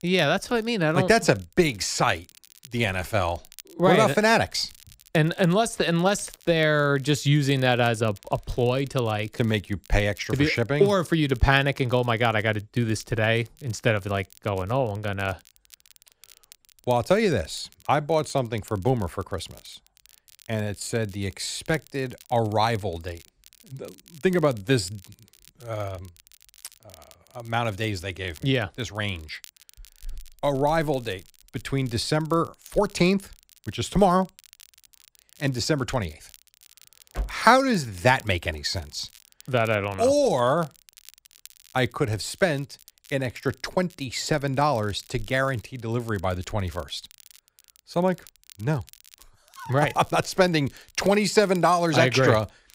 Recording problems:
crackle, like an old record; faint; 25 dB below the speech

